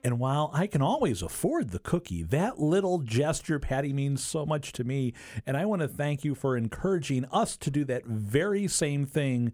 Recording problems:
none

